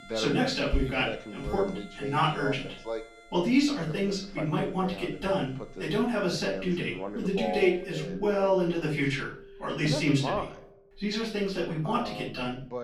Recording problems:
off-mic speech; far
room echo; slight; dies away in 0.4 s
voice in the background; loud; throughout; 9 dB below the speech
background music; noticeable; throughout; 20 dB below the speech

